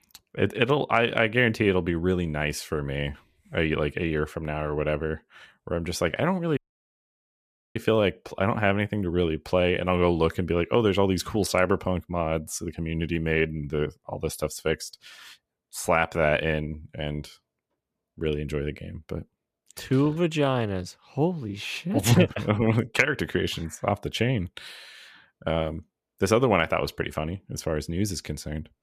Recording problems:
audio cutting out; at 6.5 s for 1 s

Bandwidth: 14.5 kHz